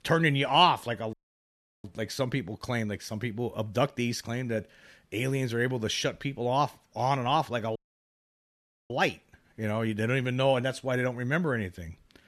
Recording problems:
audio cutting out; at 1 s for 0.5 s and at 8 s for 1 s

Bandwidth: 13.5 kHz